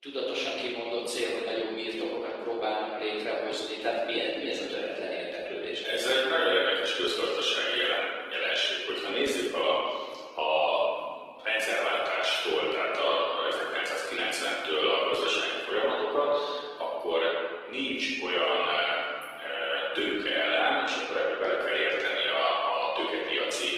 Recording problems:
room echo; strong; dies away in 1.6 s
off-mic speech; far
thin; somewhat; fading below 300 Hz
garbled, watery; slightly; nothing above 15.5 kHz

